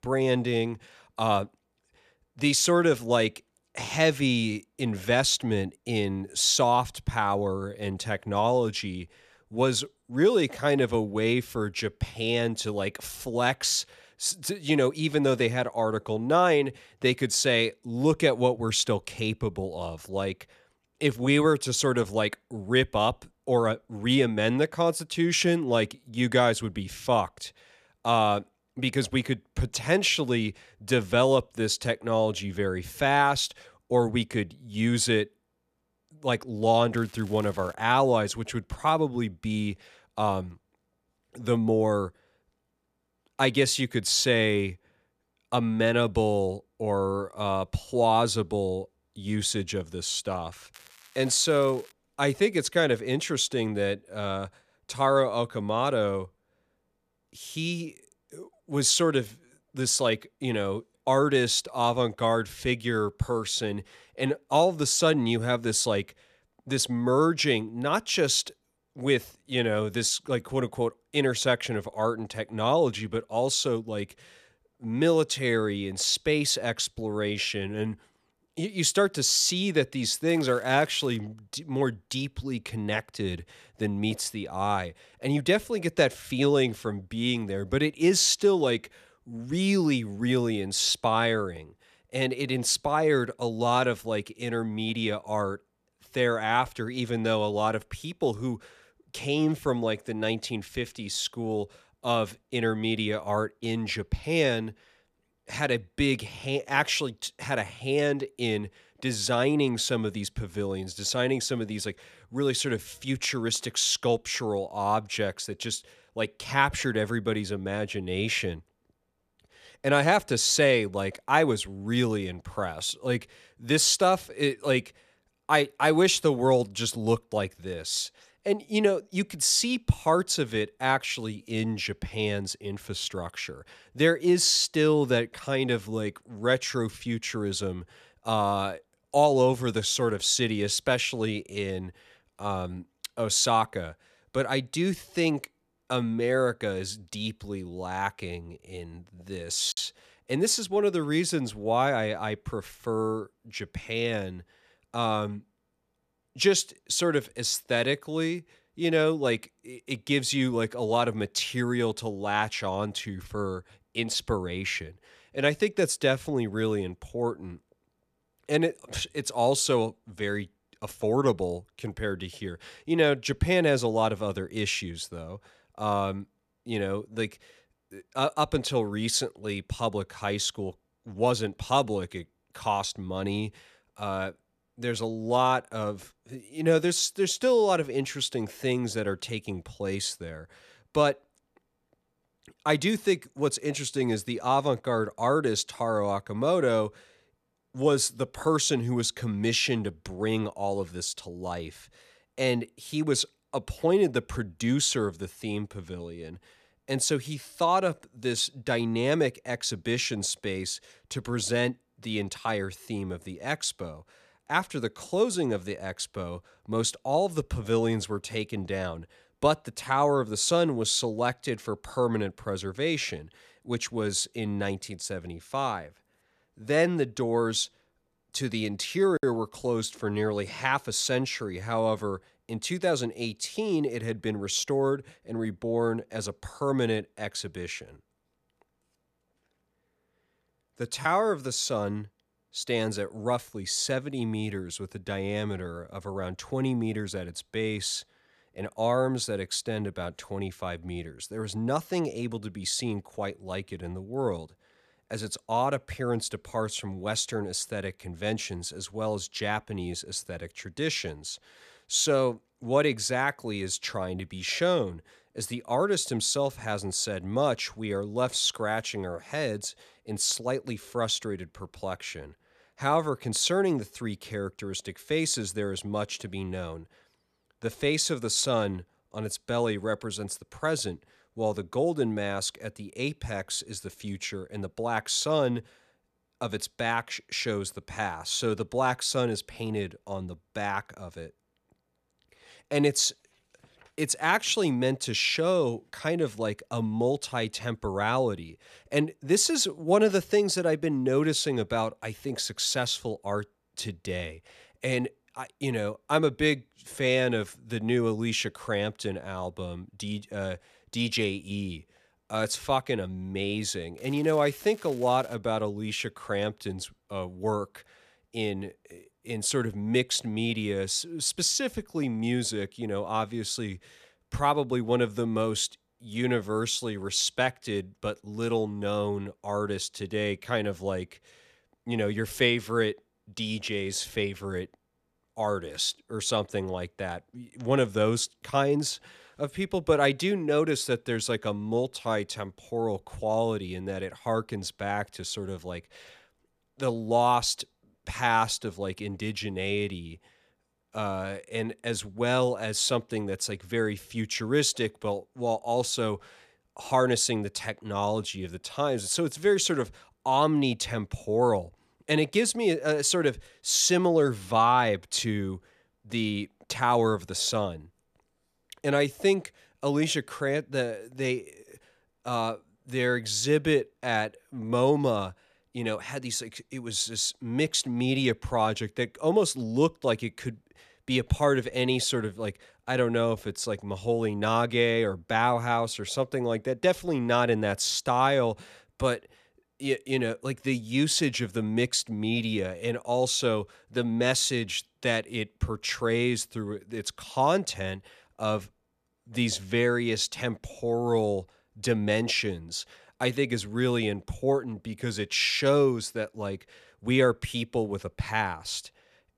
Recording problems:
crackling; faint; 4 times, first at 37 s; 25 dB below the speech

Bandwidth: 14.5 kHz